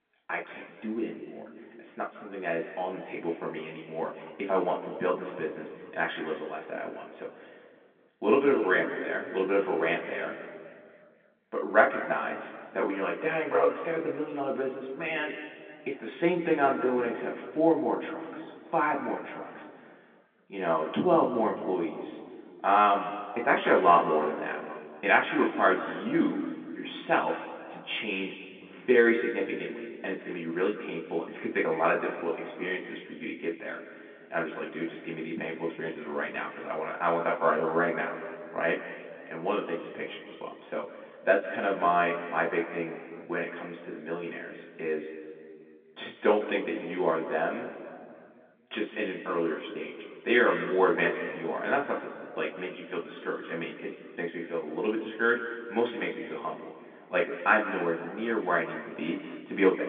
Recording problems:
off-mic speech; far
room echo; noticeable; dies away in 2 s
phone-call audio; nothing above 3.5 kHz
muffled; very slightly; fading above 2.5 kHz

